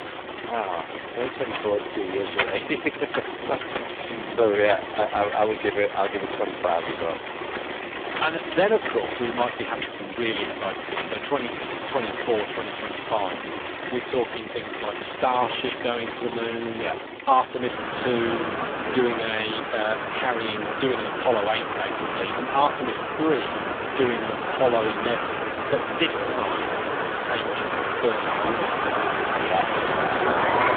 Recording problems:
phone-call audio; poor line
traffic noise; loud; throughout; 2 dB below the speech

